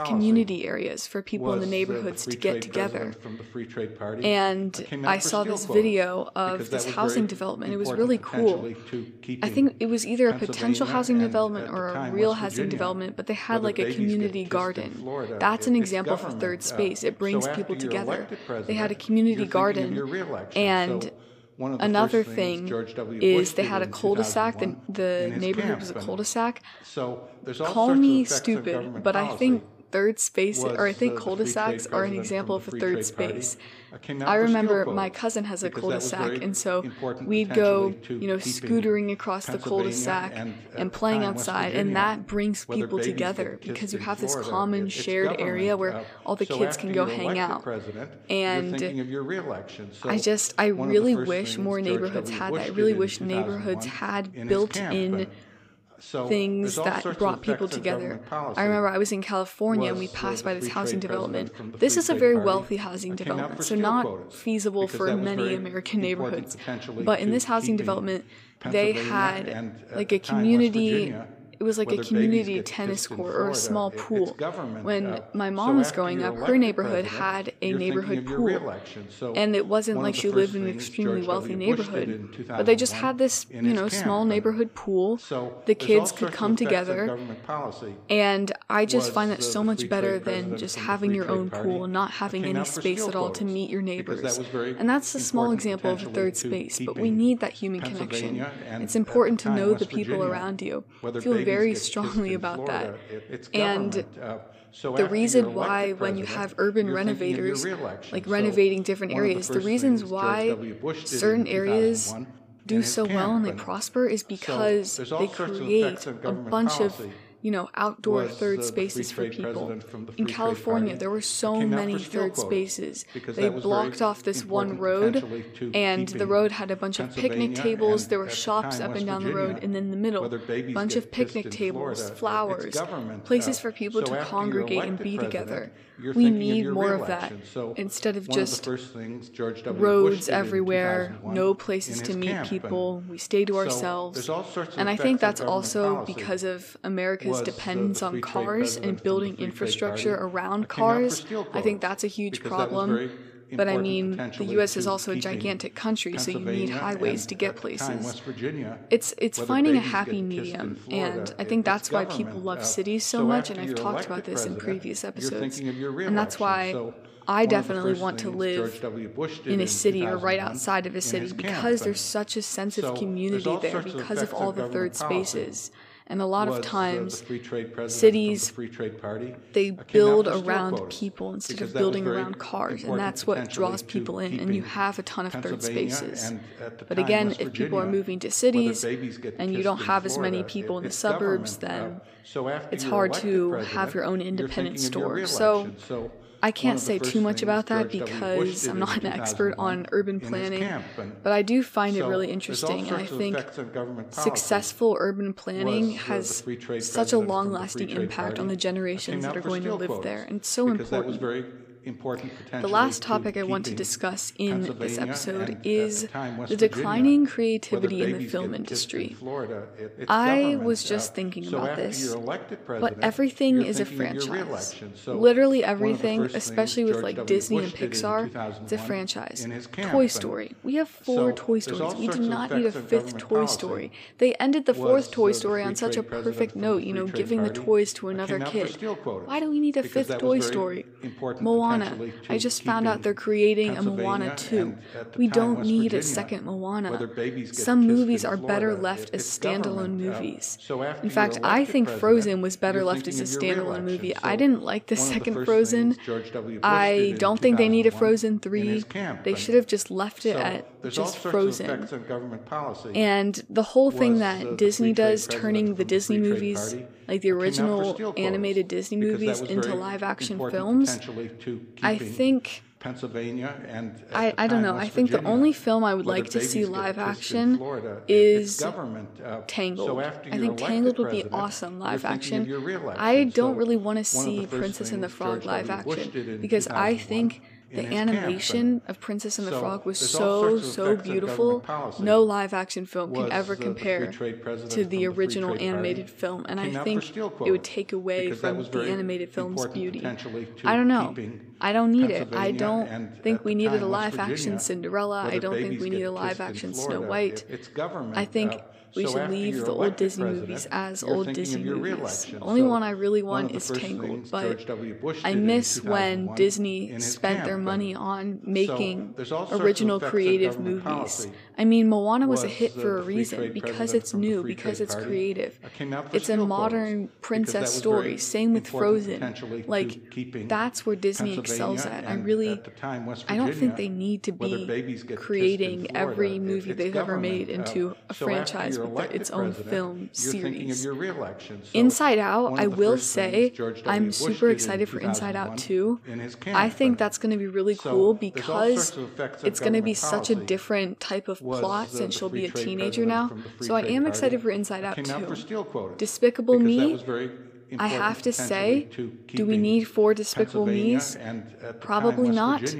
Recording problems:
voice in the background; loud; throughout; 8 dB below the speech

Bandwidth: 15 kHz